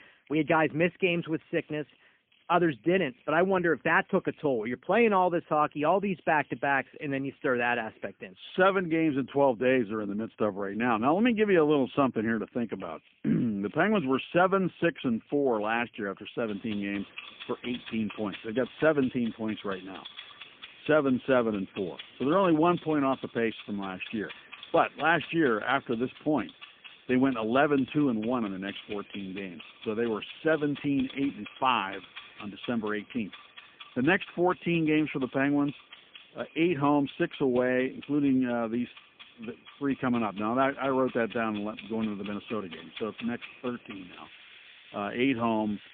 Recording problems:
phone-call audio; poor line; nothing above 3 kHz
household noises; noticeable; throughout; 20 dB below the speech

